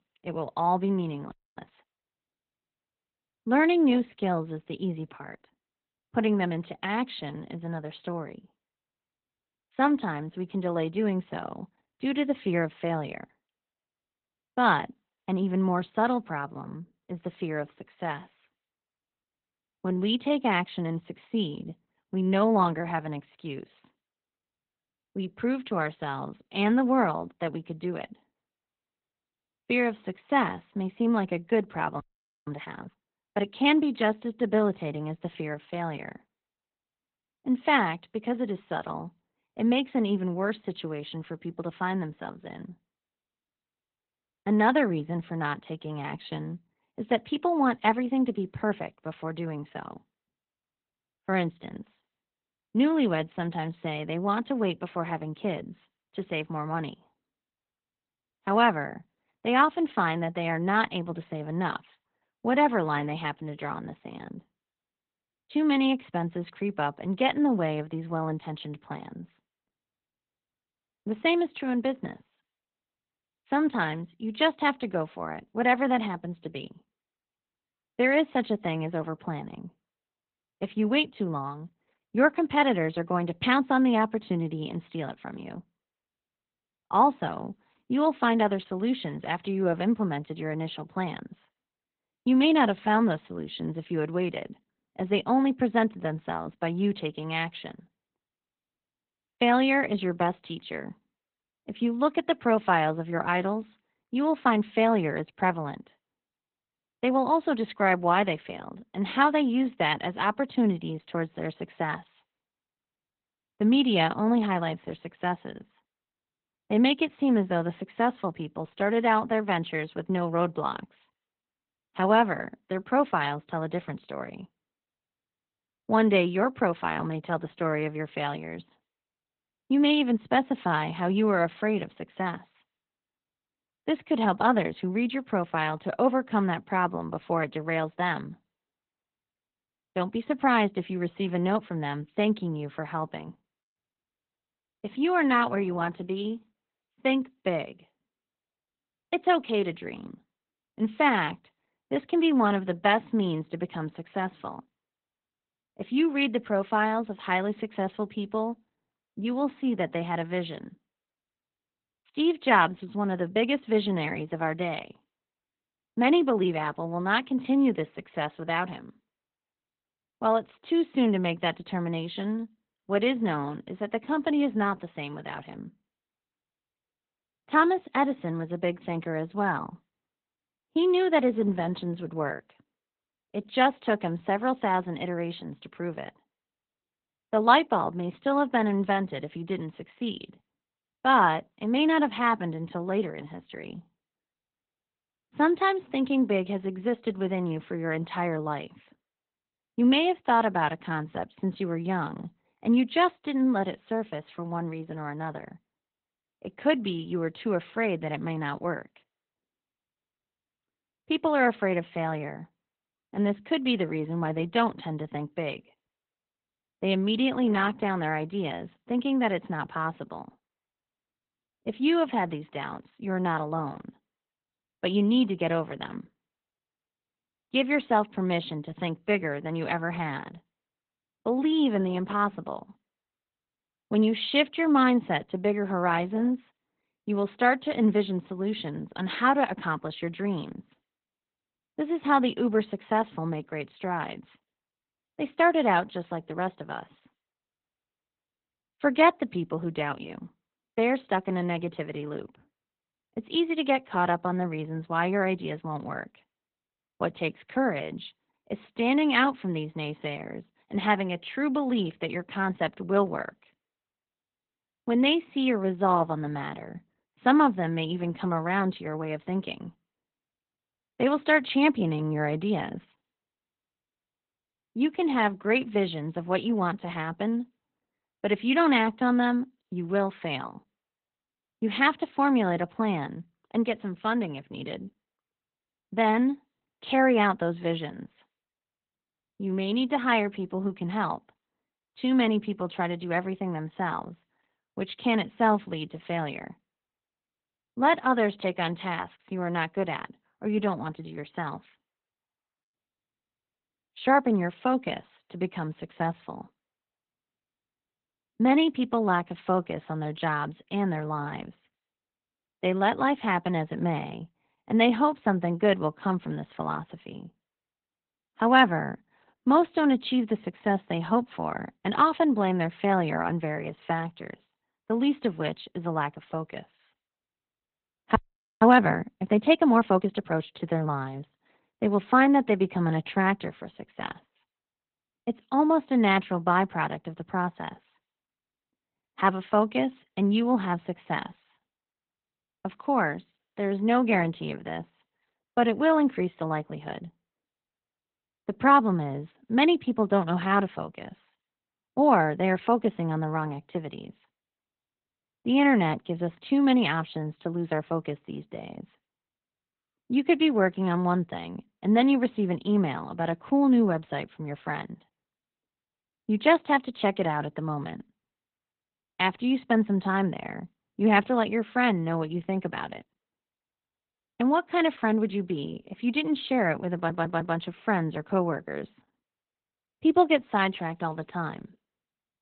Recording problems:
garbled, watery; badly; nothing above 3.5 kHz
audio freezing; at 1.5 s, at 32 s and at 5:28
audio stuttering; at 6:17

